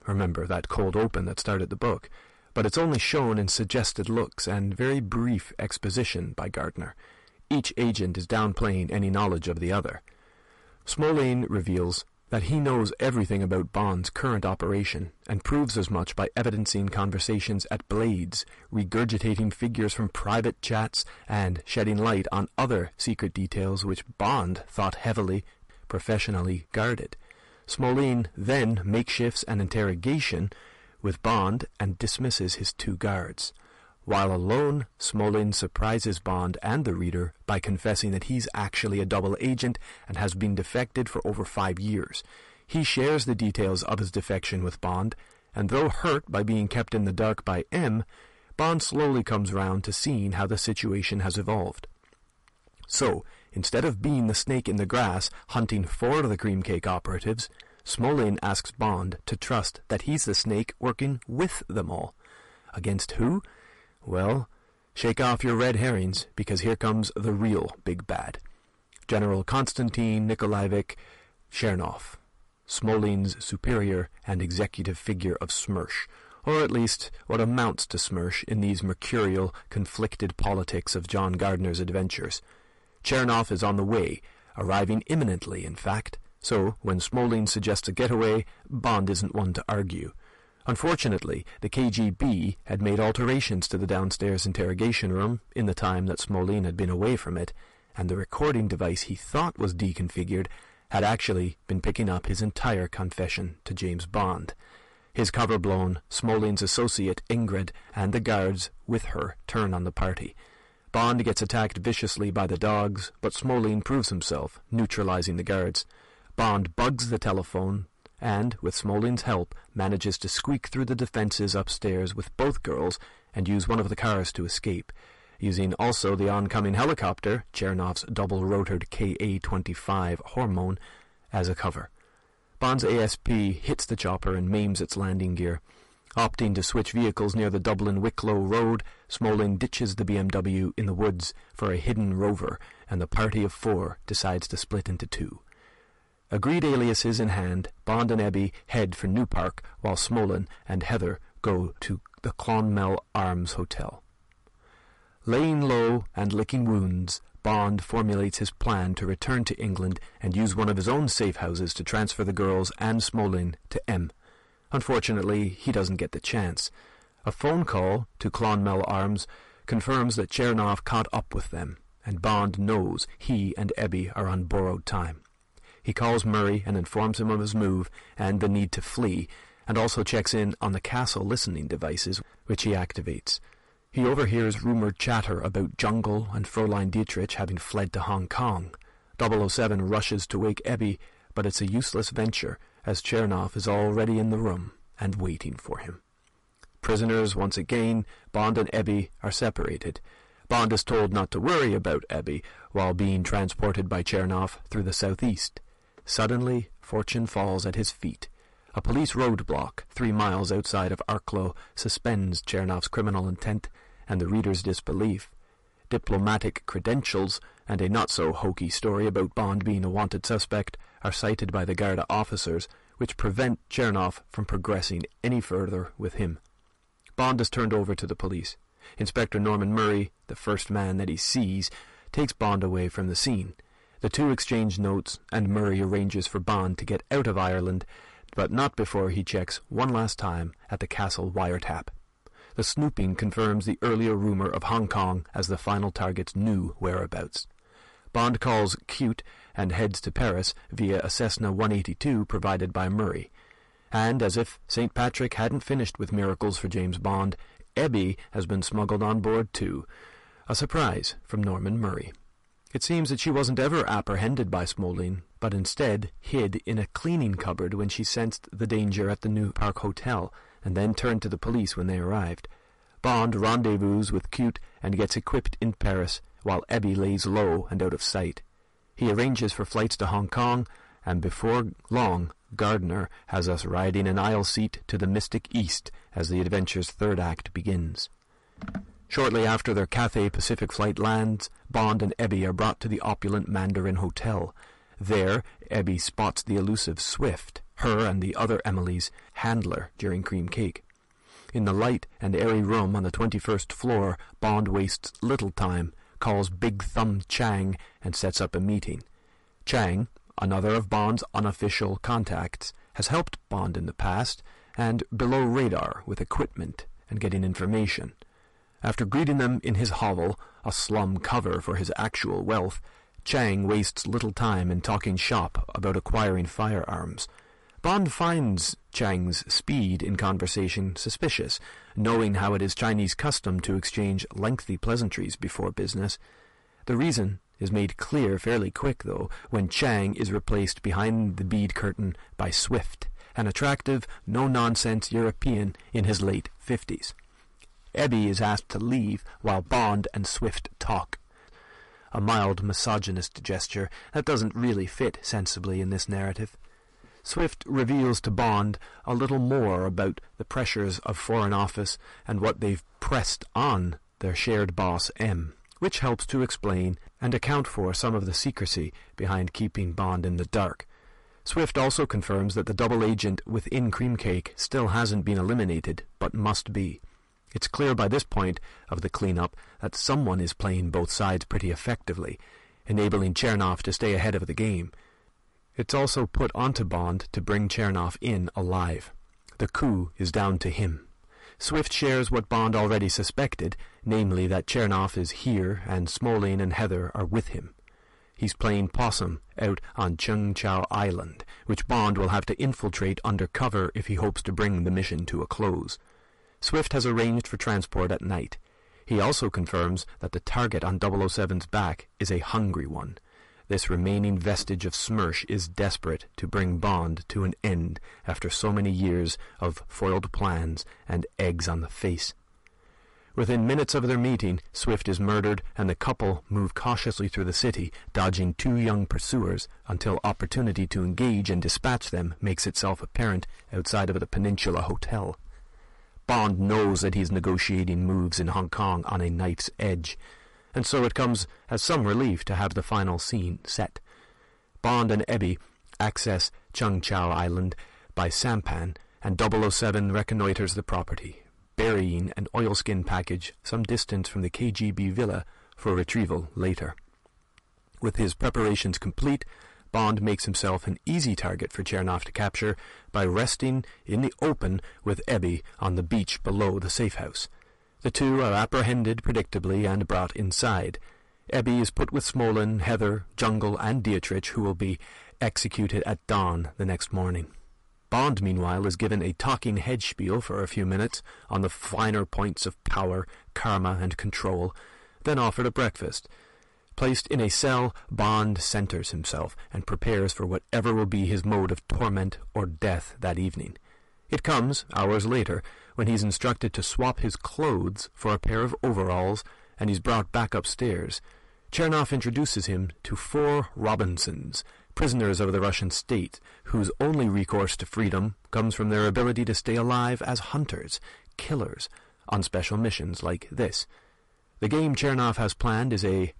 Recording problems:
distortion; heavy; 8 dB below the speech
garbled, watery; slightly; nothing above 11 kHz

